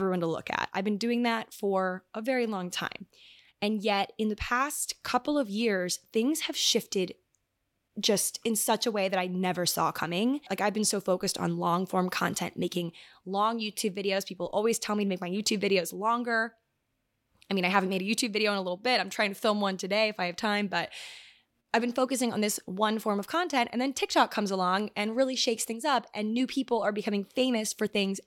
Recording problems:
abrupt cut into speech; at the start

